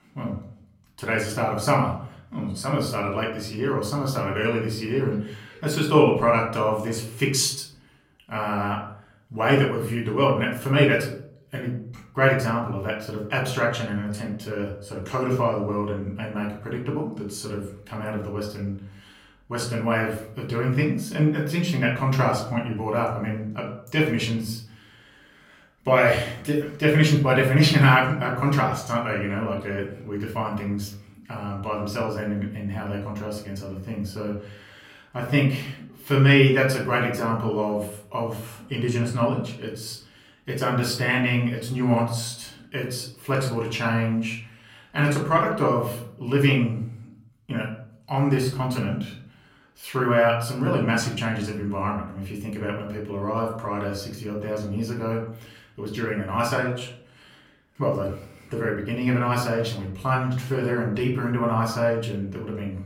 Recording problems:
off-mic speech; far
room echo; slight; dies away in 0.5 s

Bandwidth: 16 kHz